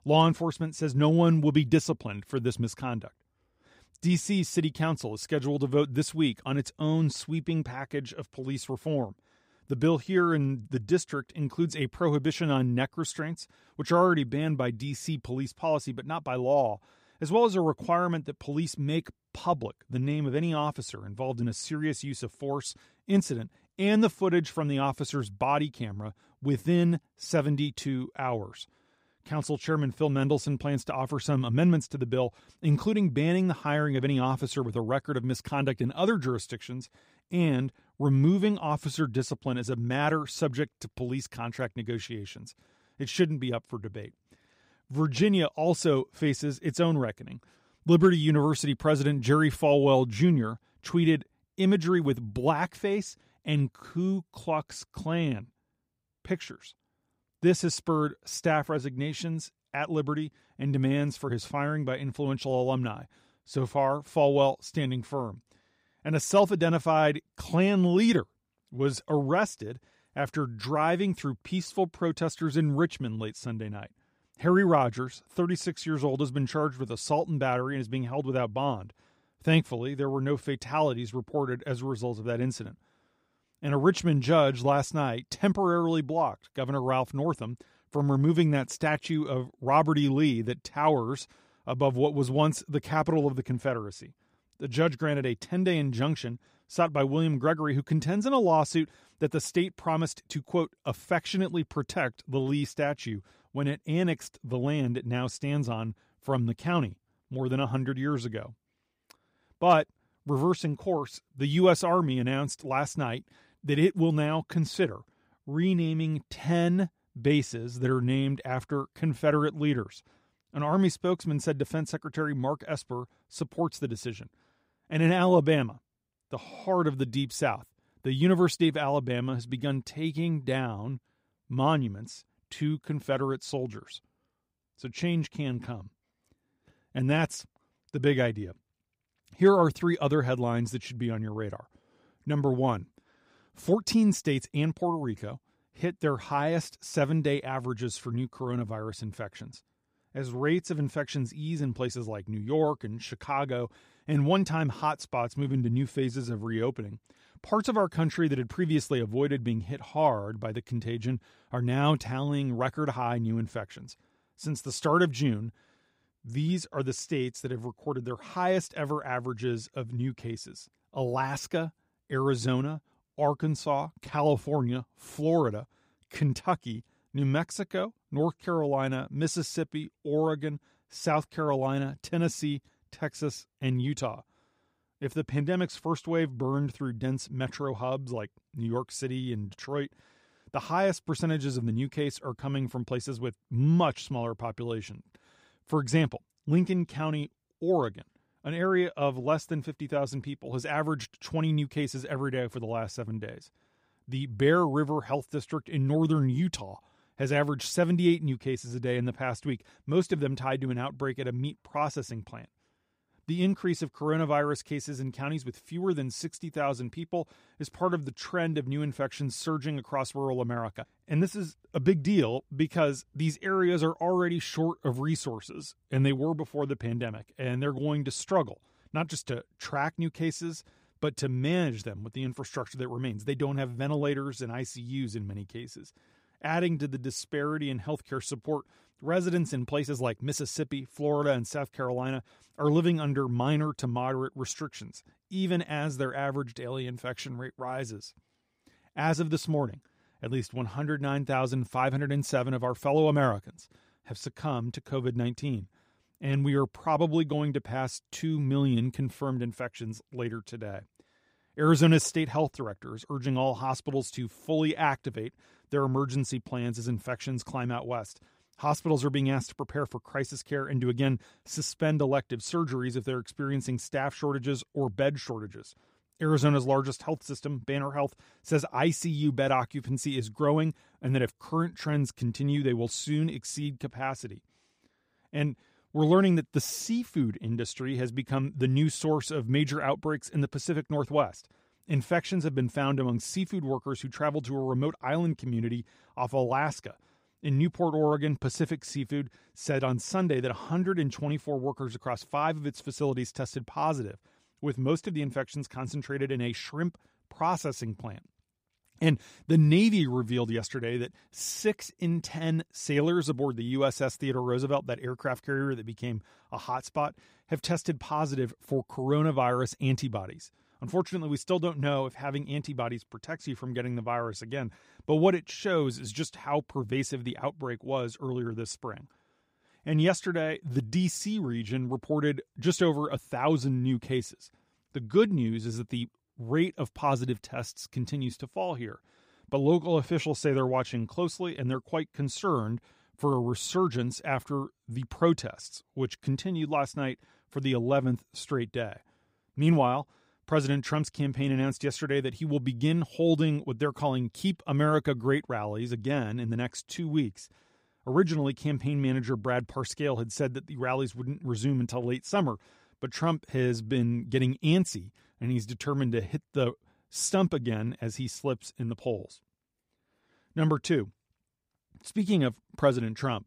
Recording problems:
none

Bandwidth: 15.5 kHz